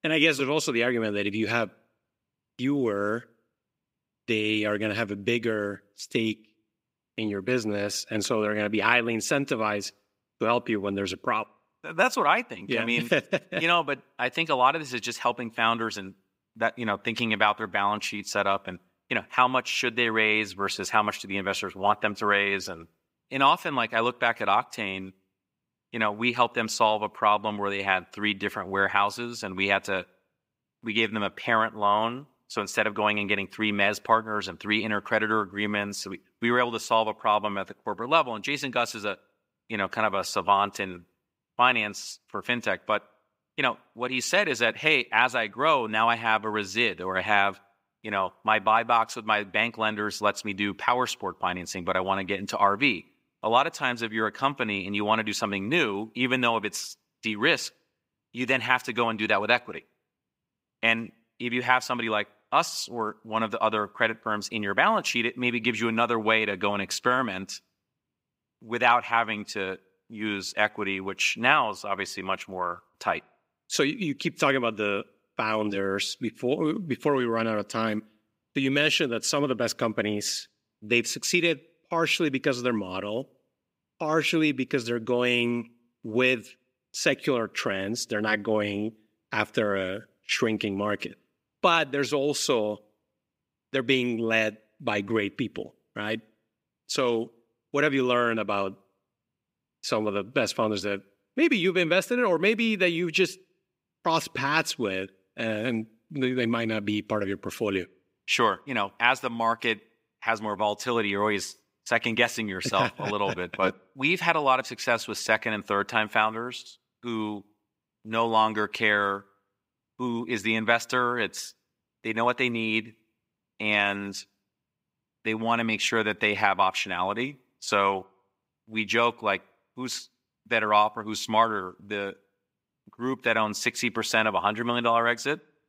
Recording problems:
thin; somewhat; fading below 250 Hz

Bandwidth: 15.5 kHz